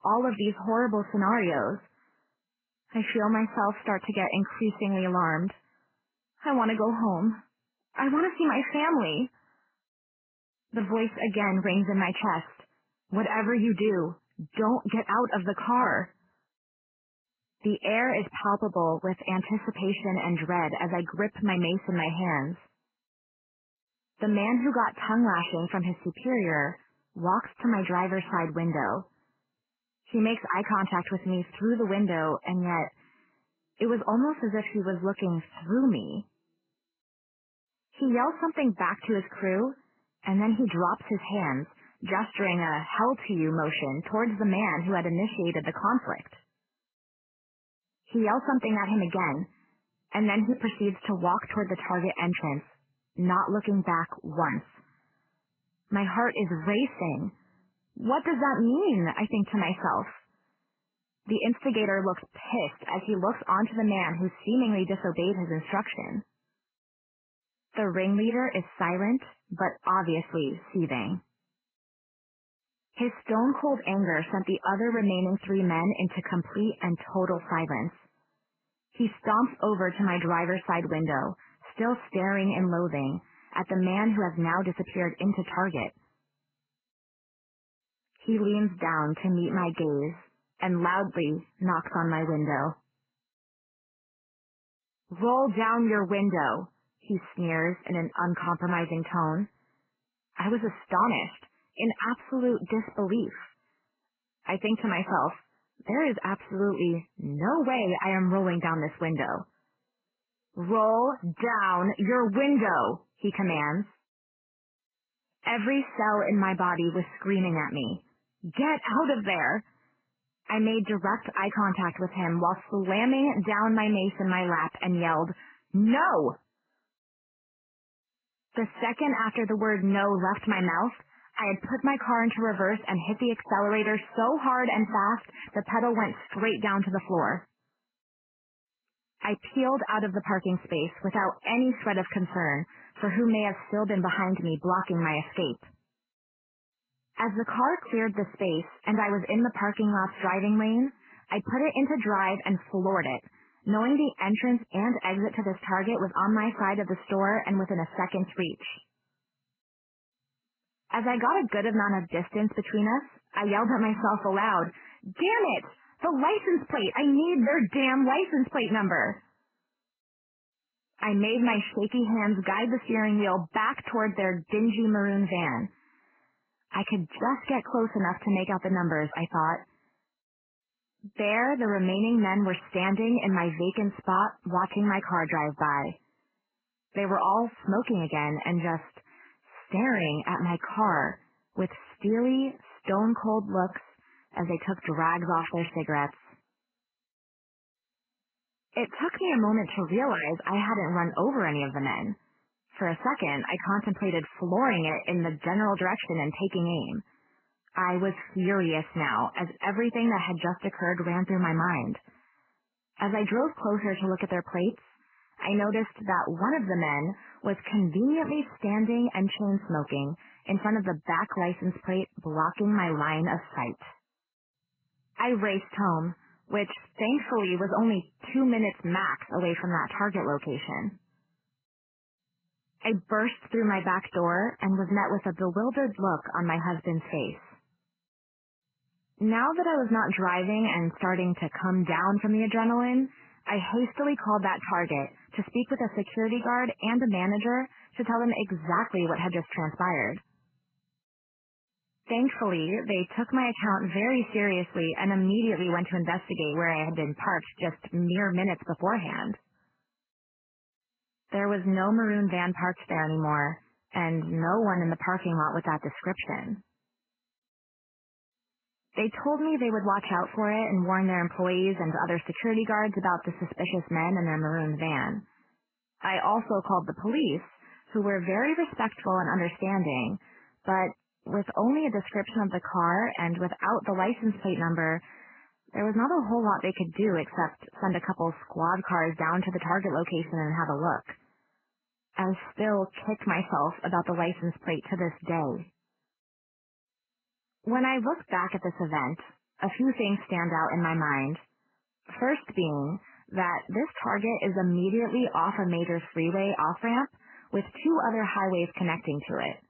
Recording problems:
garbled, watery; badly; nothing above 3 kHz

